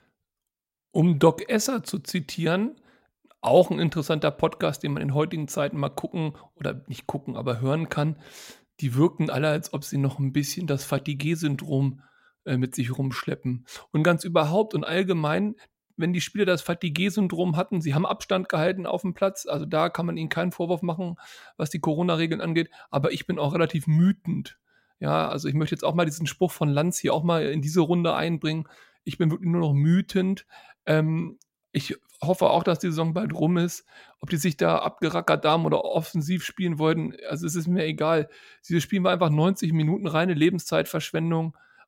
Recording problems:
none

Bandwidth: 16 kHz